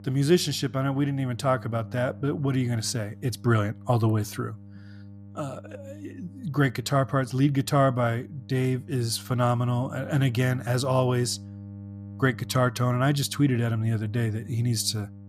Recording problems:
electrical hum; faint; throughout; 50 Hz, 25 dB below the speech

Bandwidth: 14.5 kHz